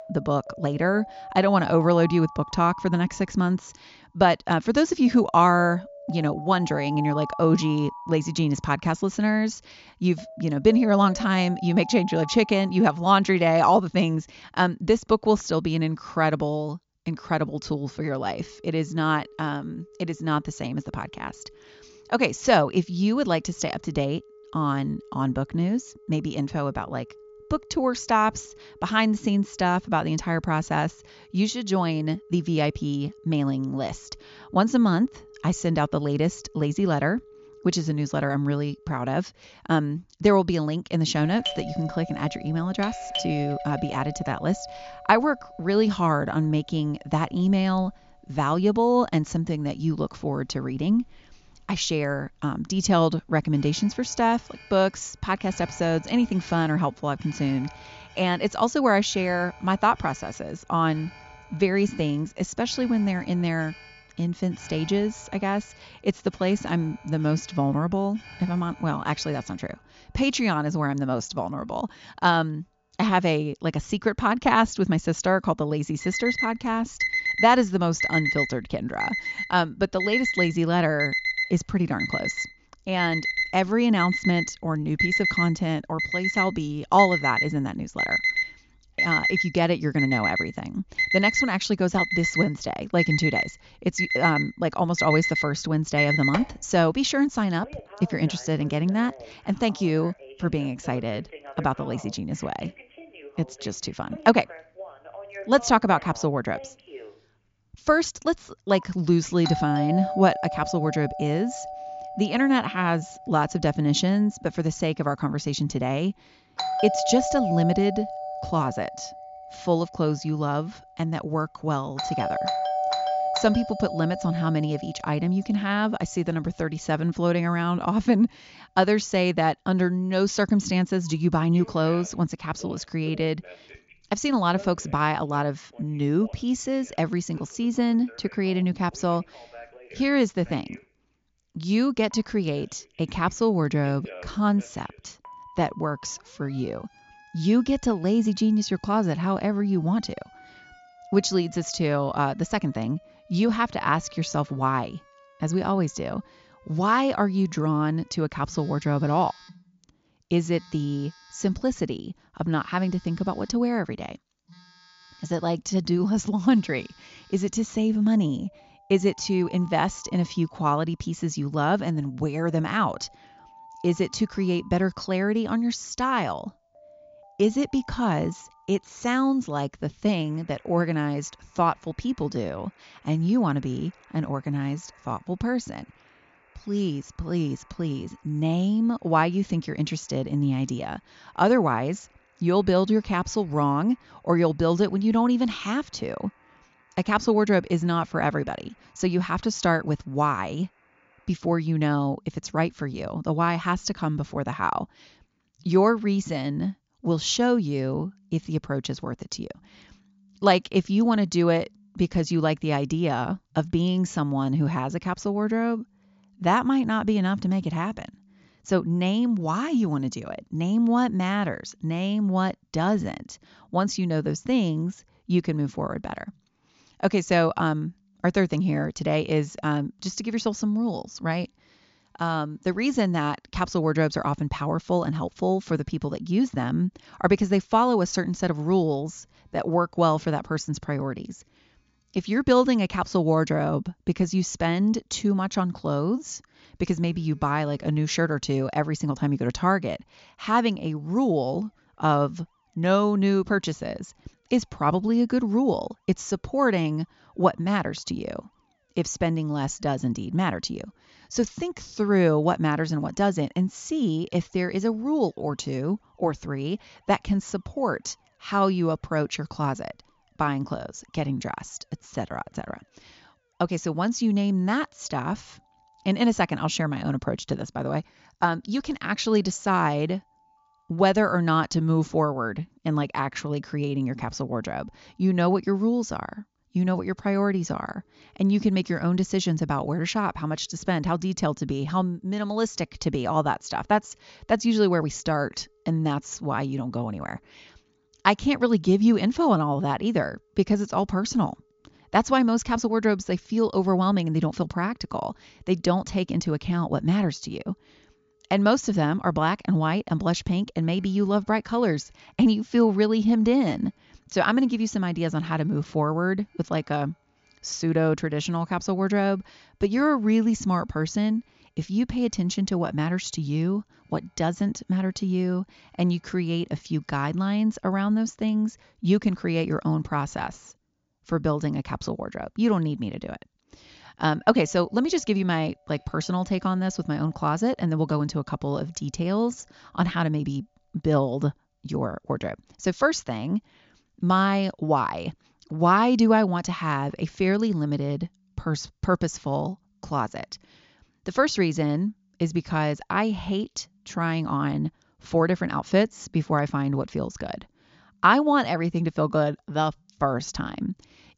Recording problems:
high frequencies cut off; noticeable; nothing above 7.5 kHz
alarms or sirens; loud; throughout; 6 dB below the speech

